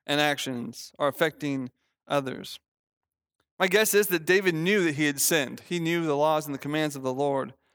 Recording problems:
none

